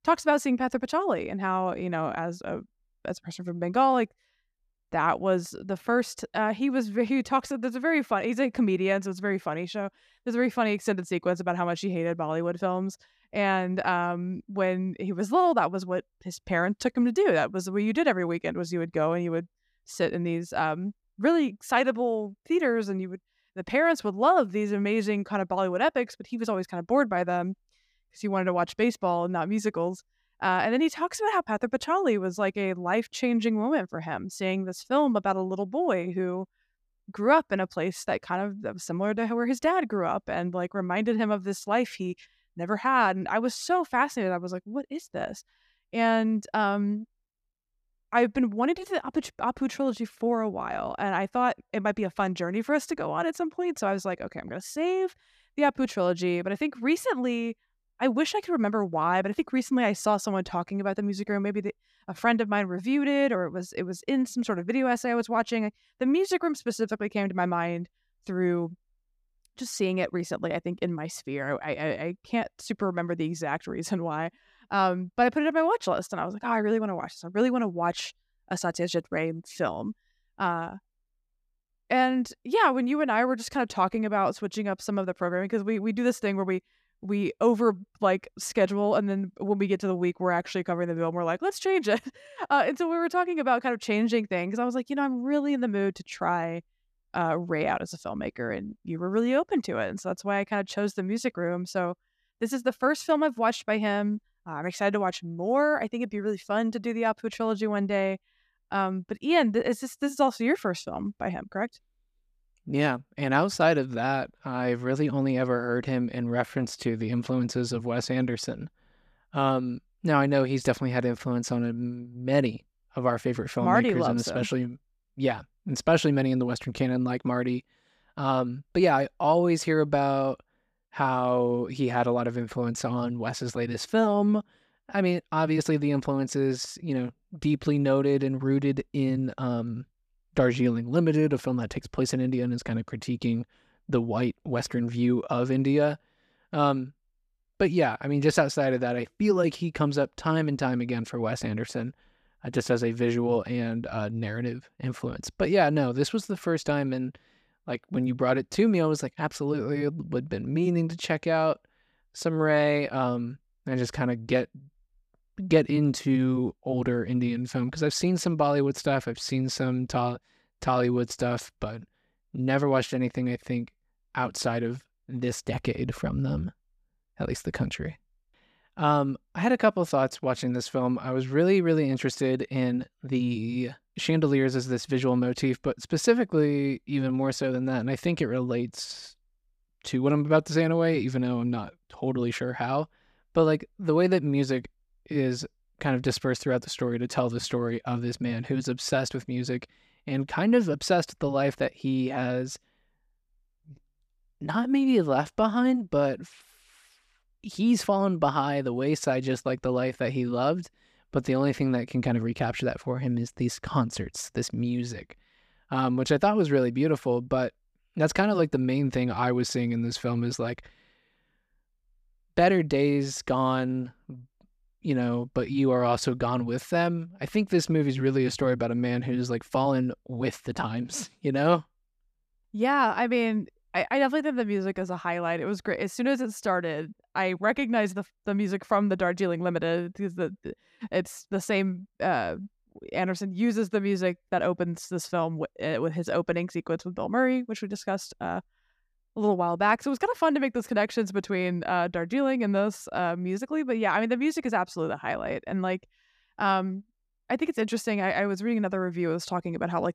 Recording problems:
none

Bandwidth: 14.5 kHz